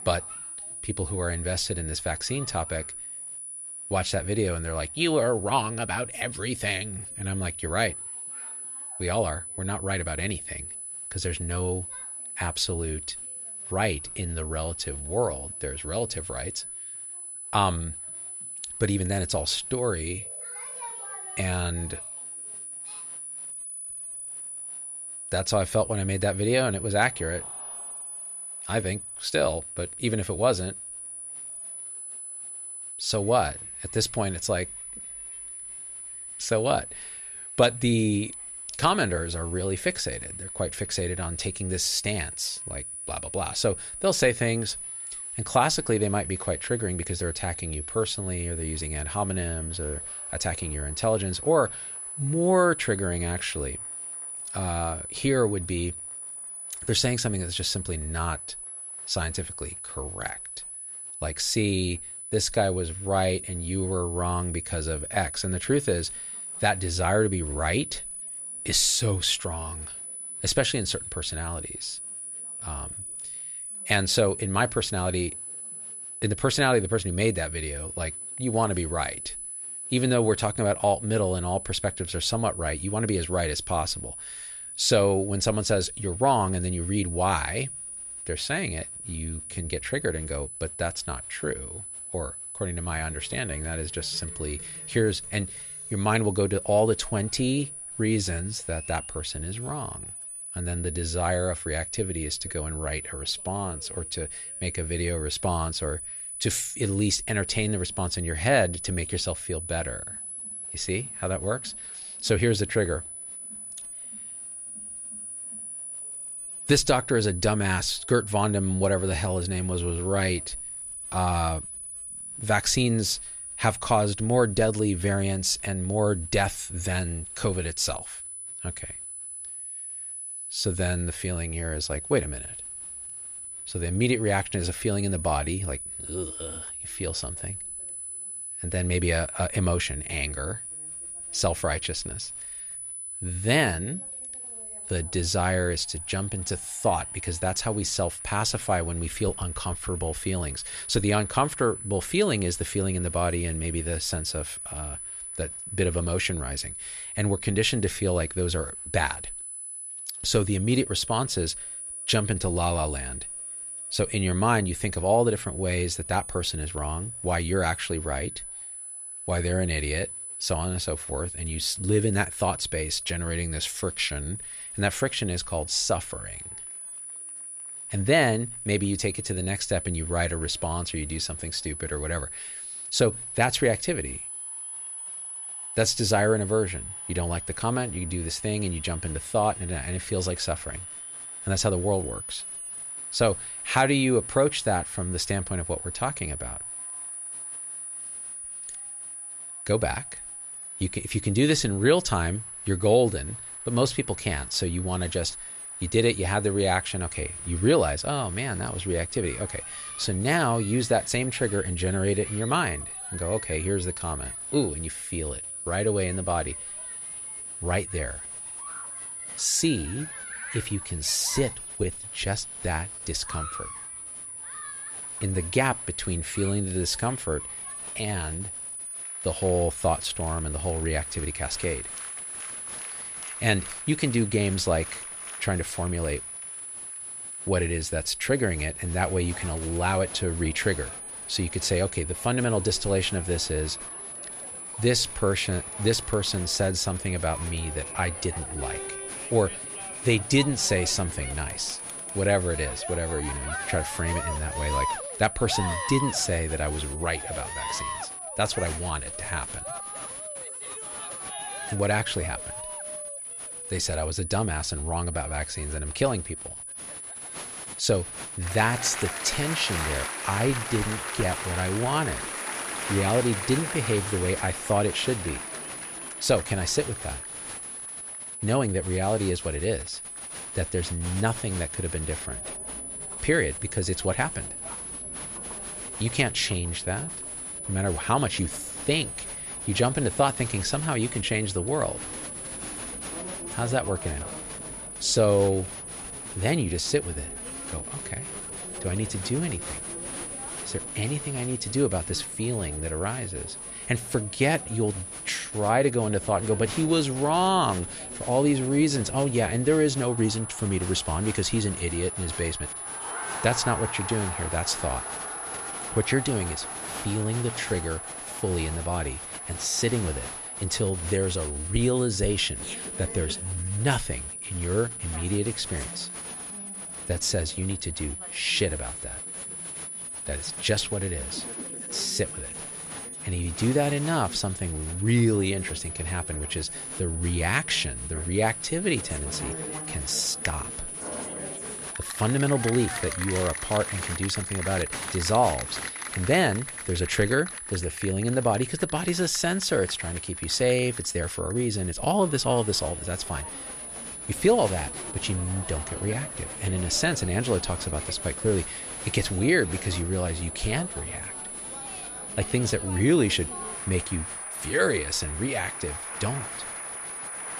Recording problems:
high-pitched whine; loud; throughout; 10 kHz, 7 dB below the speech
crowd noise; noticeable; throughout; 15 dB below the speech

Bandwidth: 14 kHz